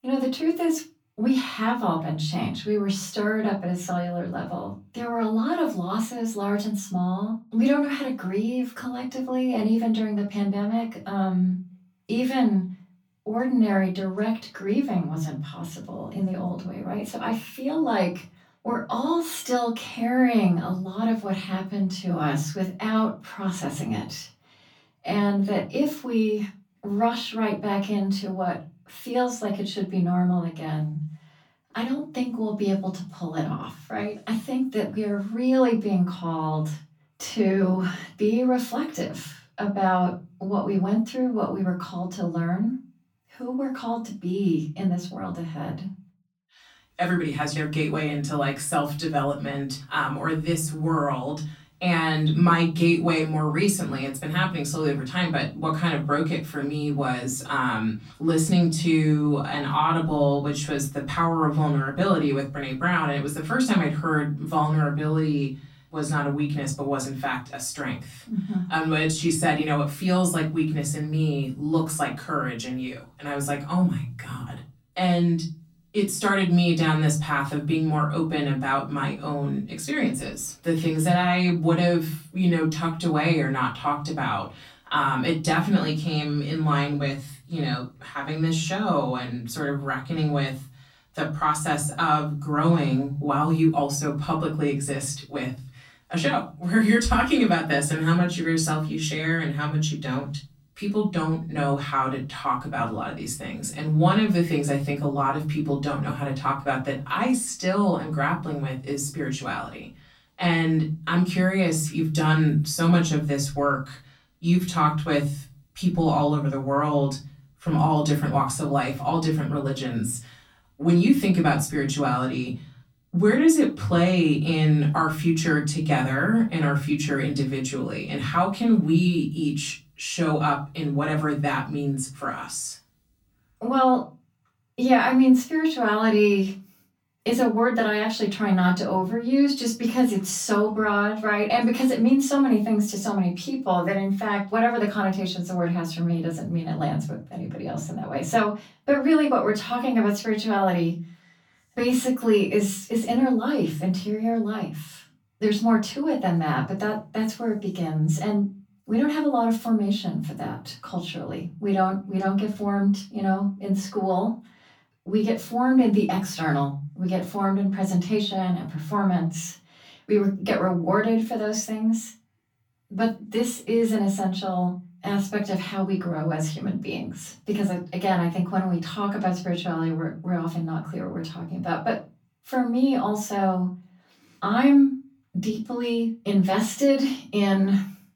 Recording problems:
off-mic speech; far
room echo; slight; dies away in 0.4 s

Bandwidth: 18.5 kHz